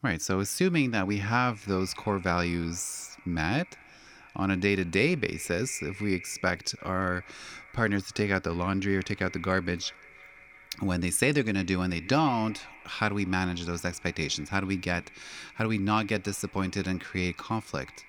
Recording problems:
echo of what is said; faint; throughout; 340 ms later, 20 dB below the speech

